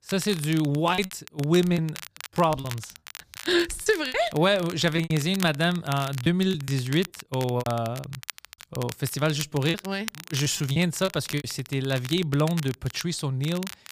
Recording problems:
crackle, like an old record; noticeable; 15 dB below the speech
choppy; very; from 1 to 4 s, from 5 to 9 s and from 9.5 to 11 s; 13% of the speech affected

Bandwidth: 15 kHz